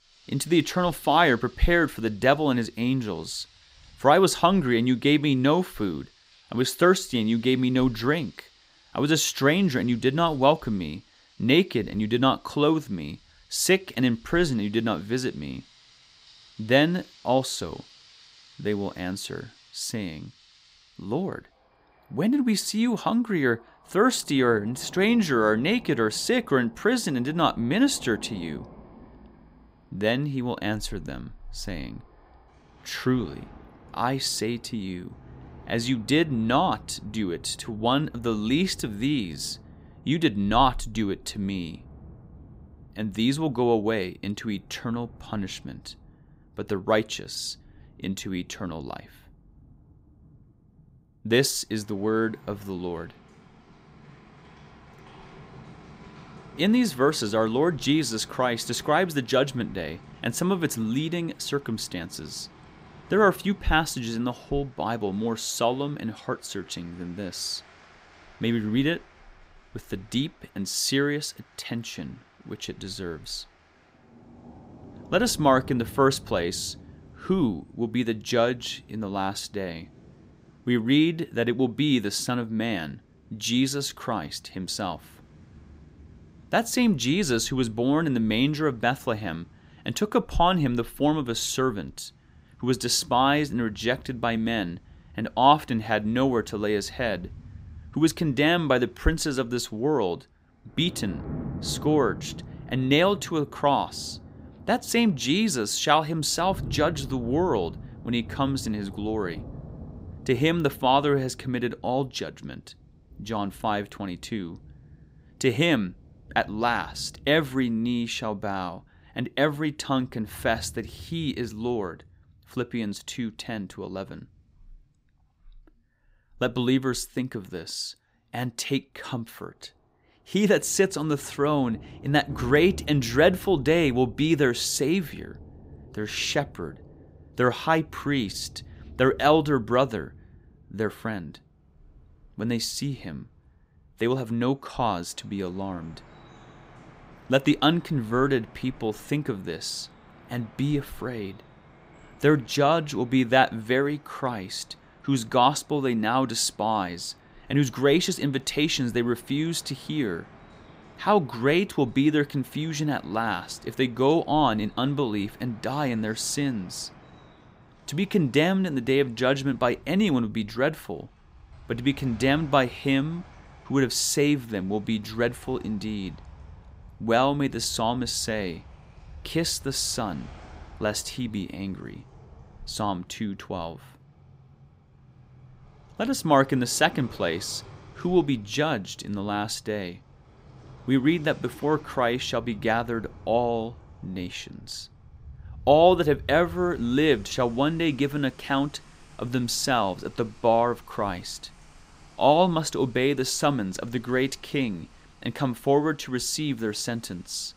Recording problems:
rain or running water; faint; throughout; 20 dB below the speech

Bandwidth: 15.5 kHz